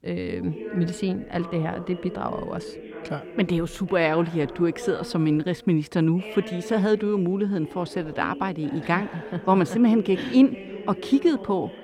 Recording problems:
background chatter; noticeable; throughout; 2 voices, 15 dB below the speech

